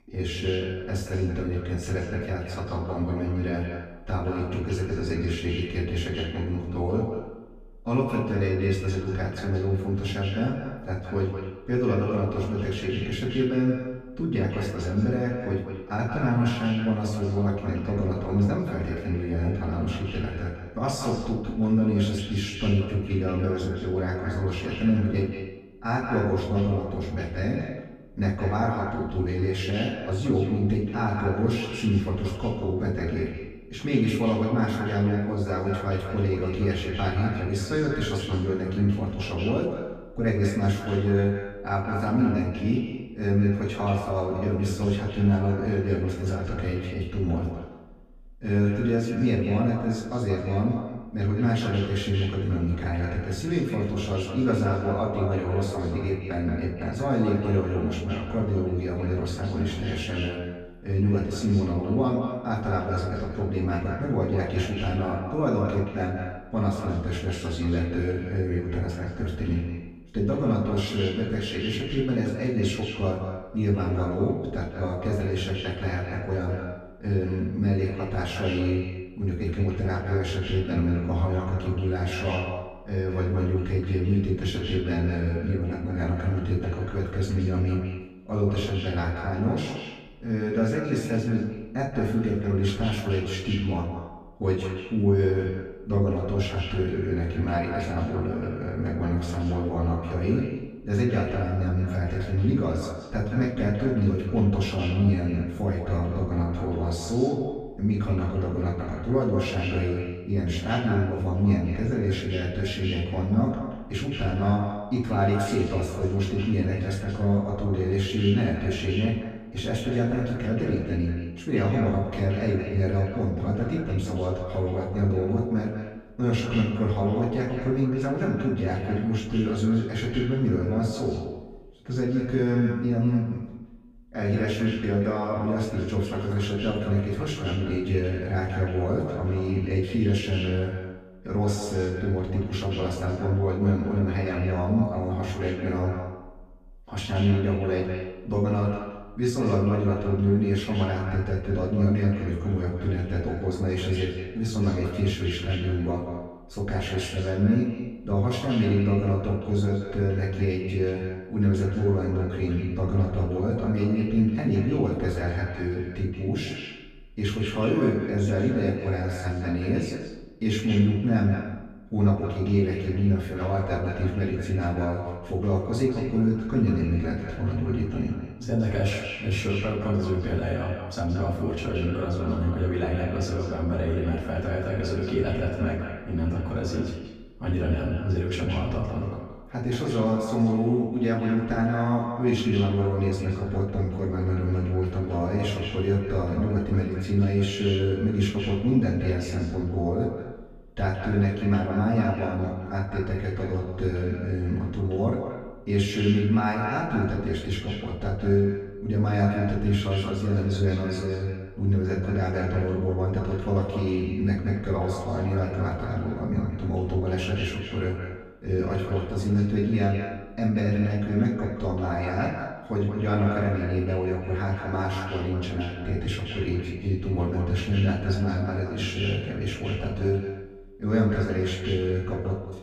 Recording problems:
echo of what is said; strong; throughout; 180 ms later, 9 dB below the speech
off-mic speech; far
room echo; noticeable; dies away in 0.4 s

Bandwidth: 15.5 kHz